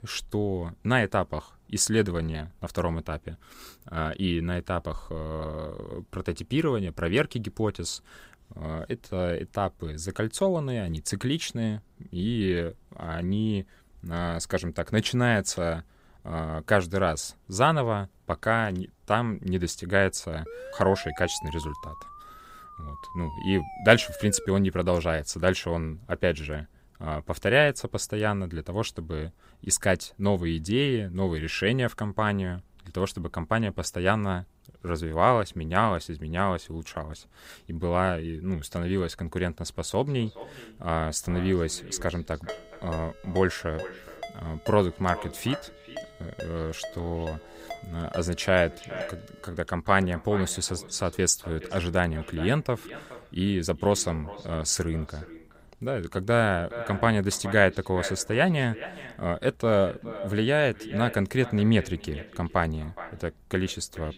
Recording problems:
echo of what is said; noticeable; from 40 s on; 420 ms later, 15 dB below the speech
siren; faint; from 20 to 24 s; peak 10 dB below the speech
phone ringing; faint; from 42 to 49 s; peak 15 dB below the speech

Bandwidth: 15.5 kHz